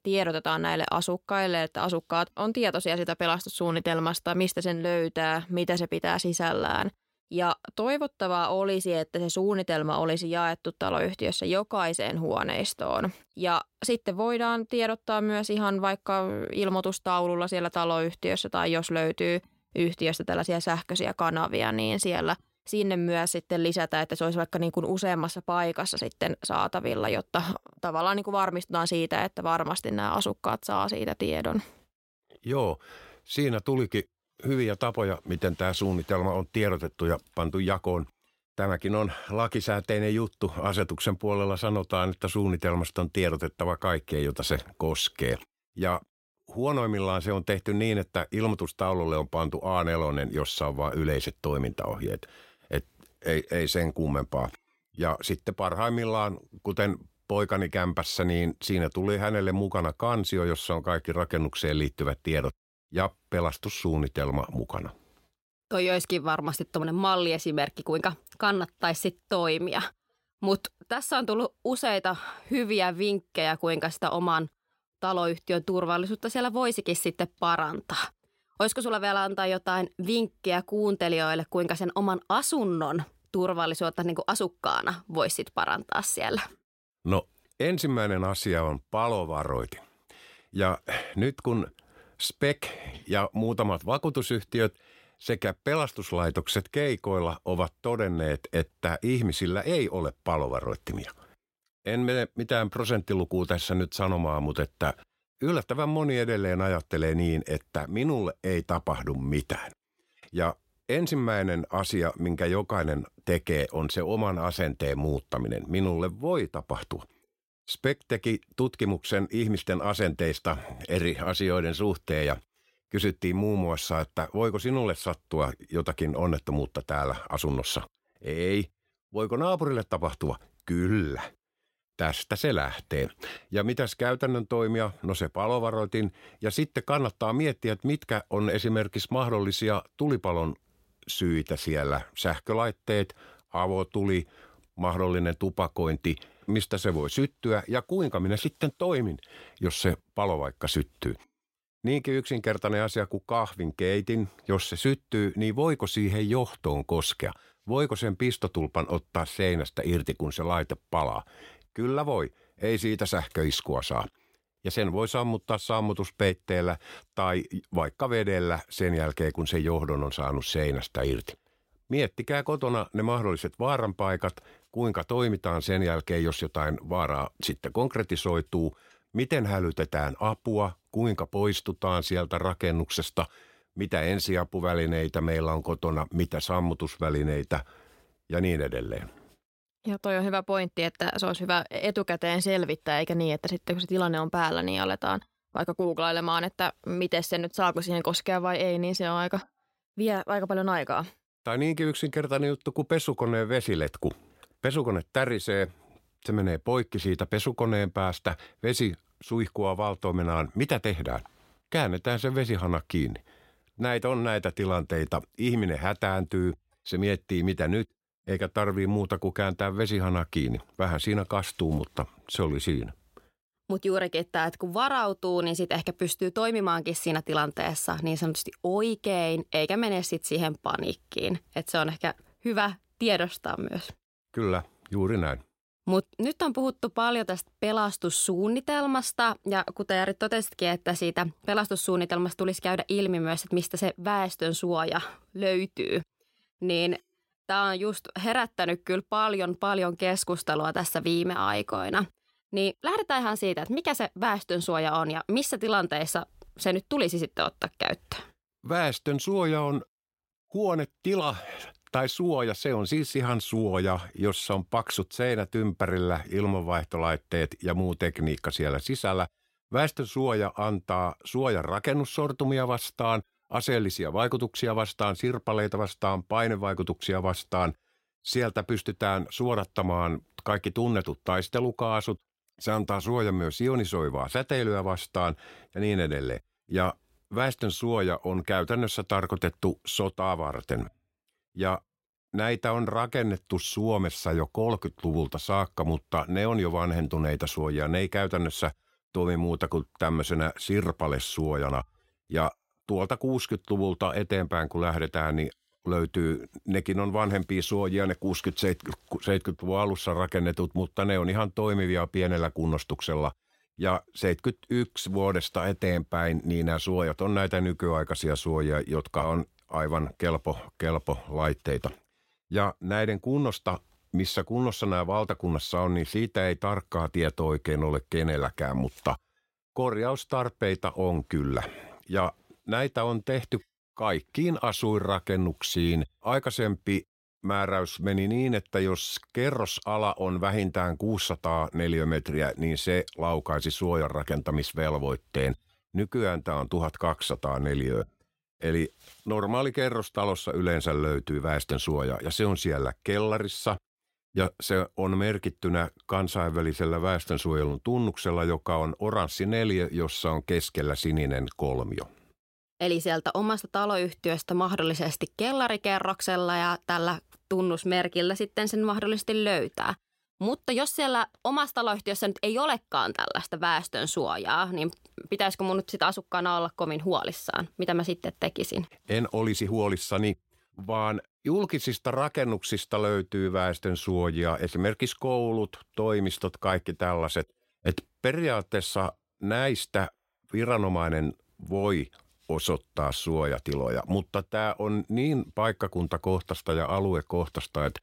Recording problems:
none

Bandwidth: 16 kHz